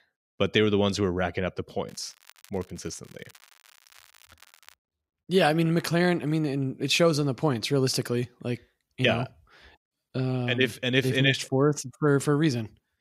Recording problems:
crackling; faint; from 2 to 4.5 s; 30 dB below the speech

